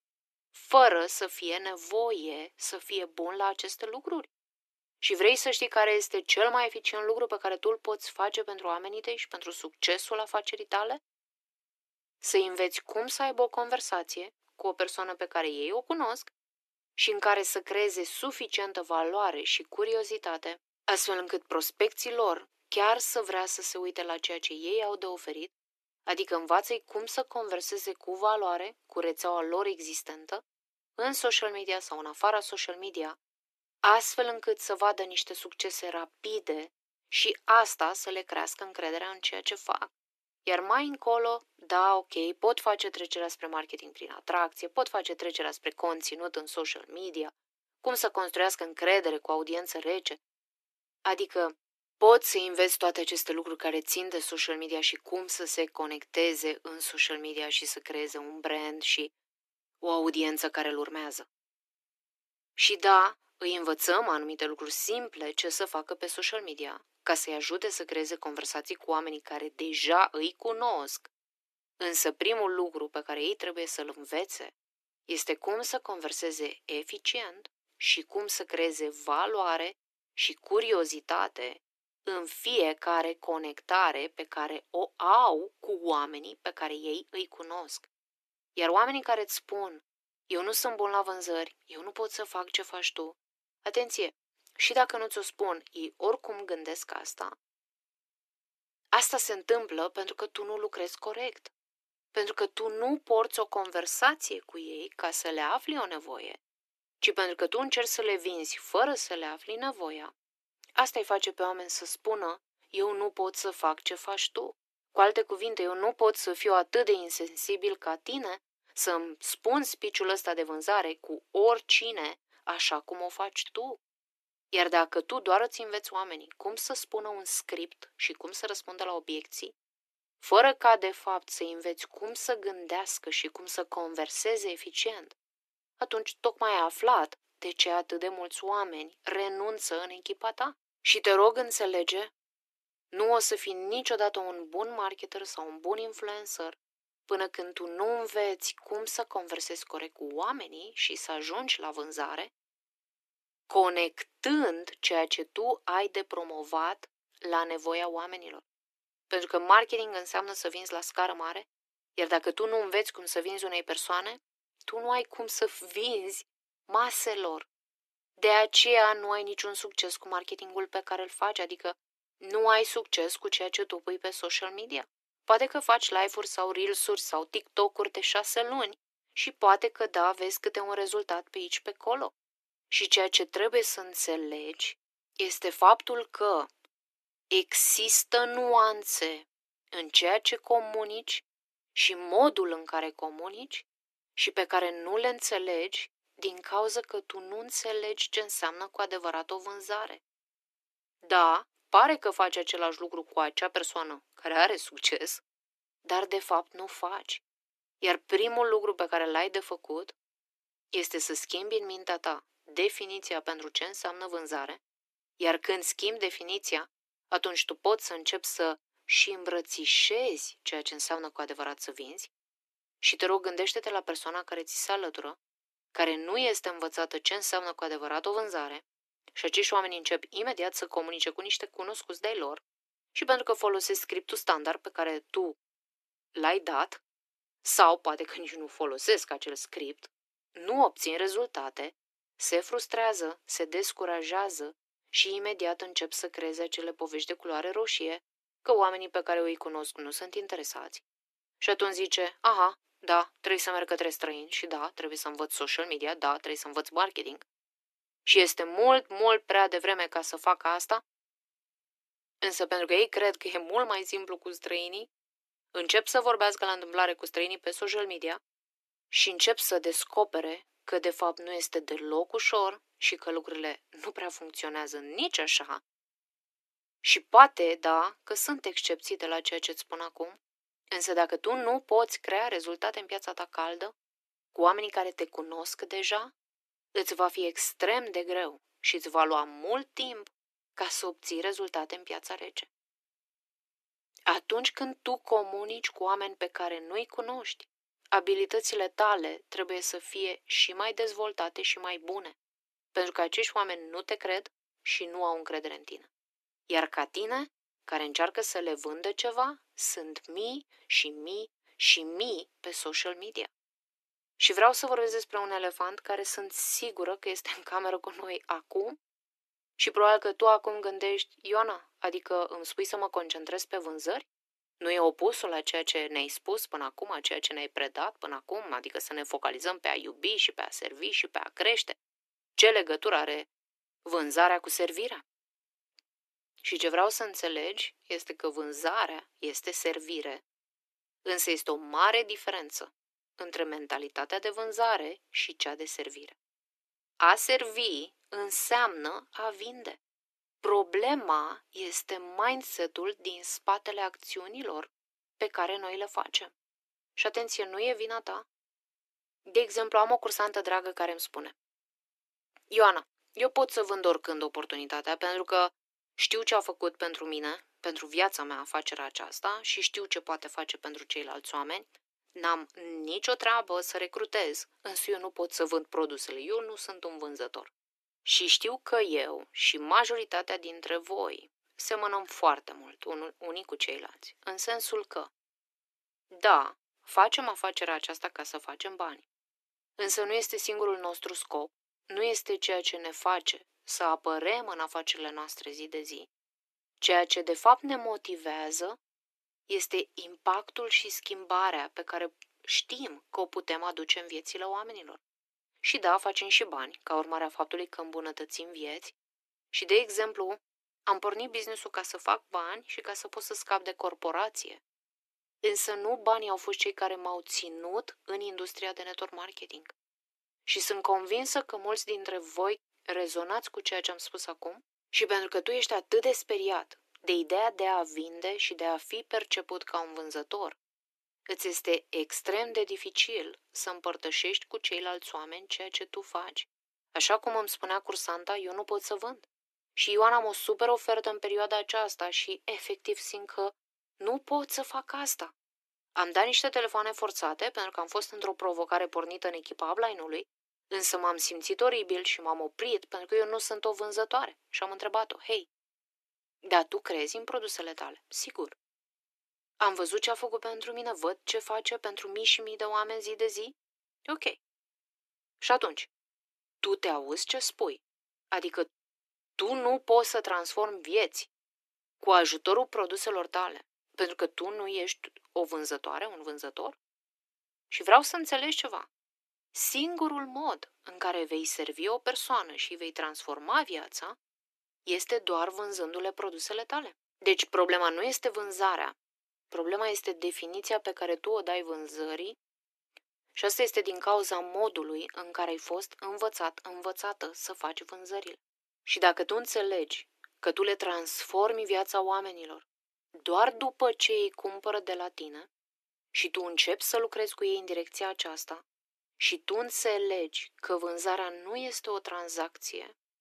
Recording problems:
thin; very; fading below 300 Hz

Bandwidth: 13.5 kHz